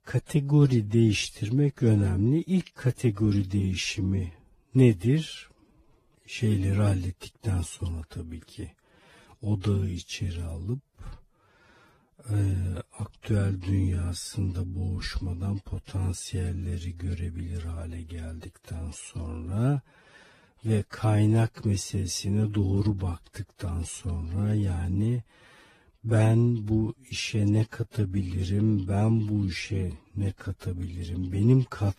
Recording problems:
wrong speed, natural pitch; too slow; 0.6 times normal speed
garbled, watery; slightly; nothing above 14.5 kHz

